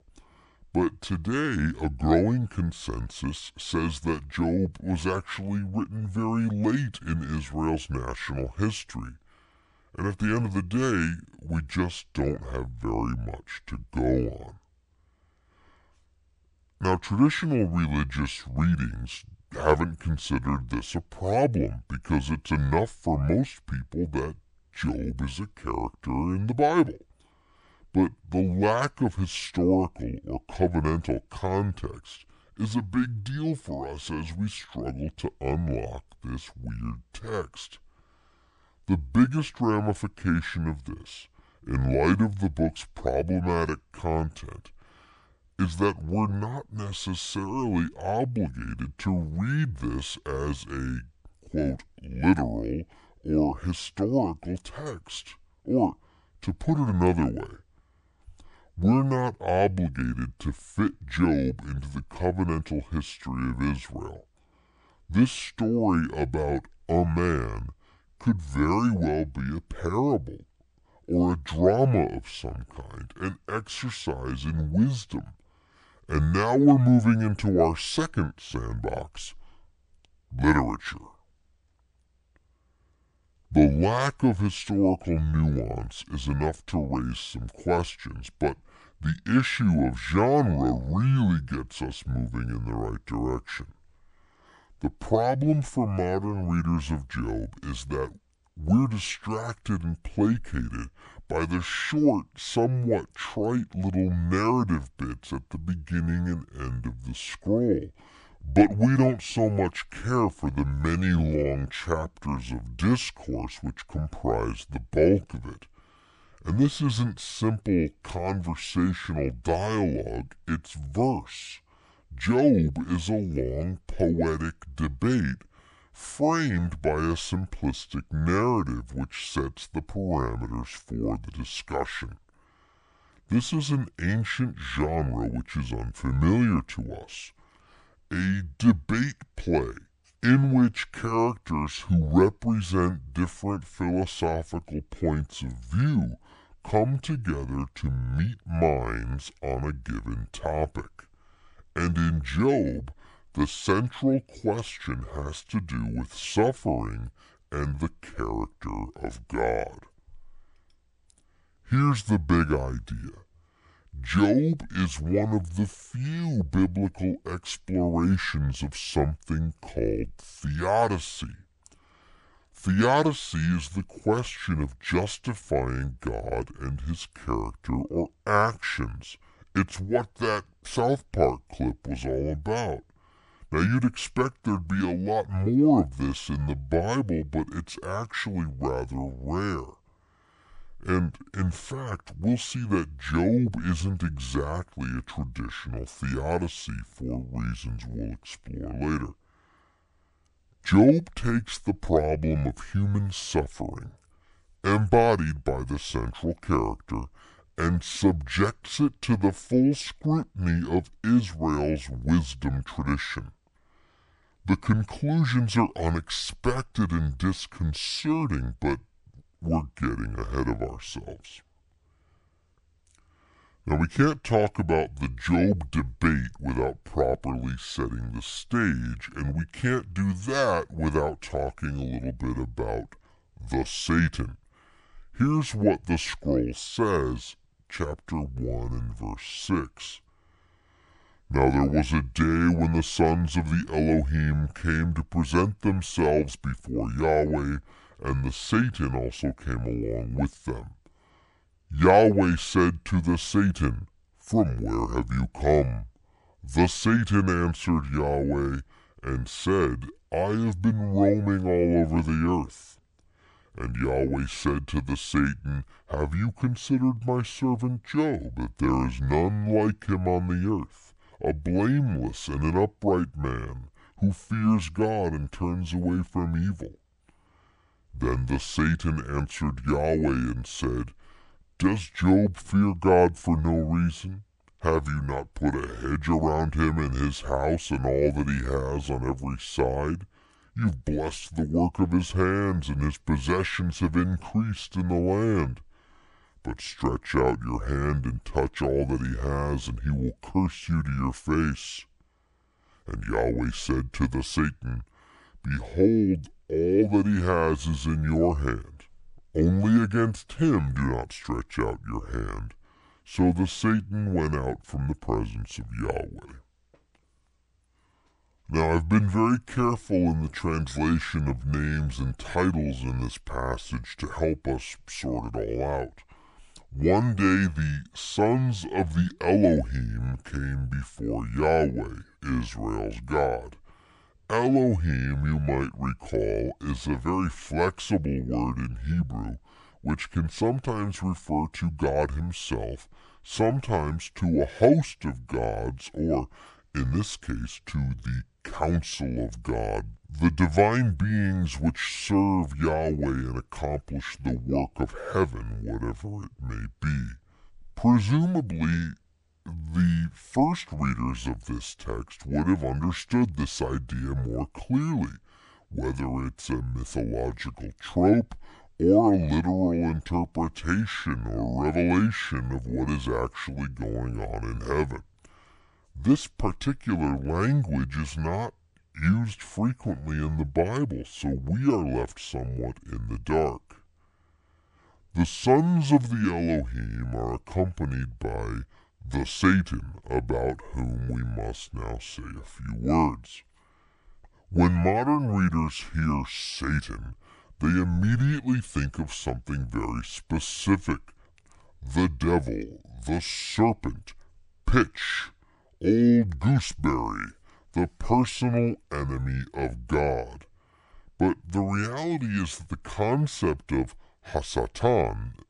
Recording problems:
wrong speed and pitch; too slow and too low; 0.7 times normal speed

